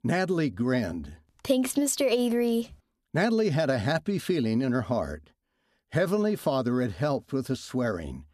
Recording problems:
none

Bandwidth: 14 kHz